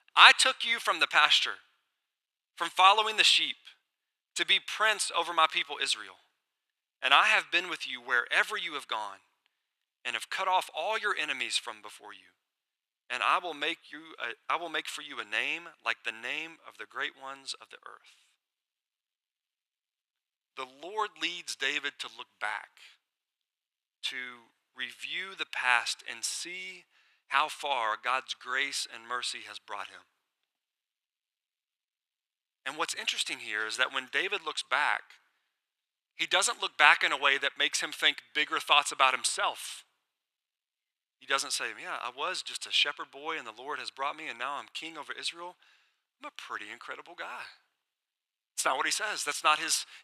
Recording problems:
thin; very; fading below 750 Hz

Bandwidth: 14.5 kHz